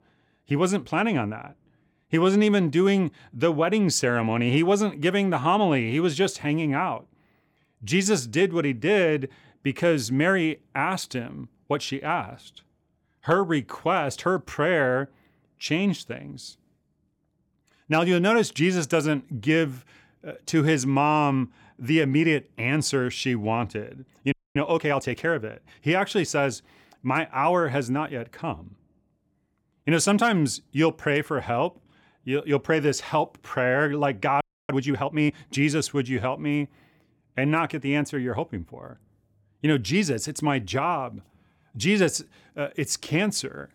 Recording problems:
audio freezing; at 24 s and at 34 s

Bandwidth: 18 kHz